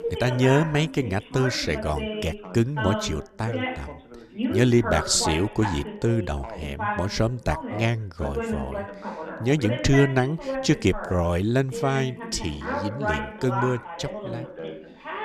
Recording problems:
background chatter; loud; throughout; 2 voices, 7 dB below the speech

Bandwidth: 14.5 kHz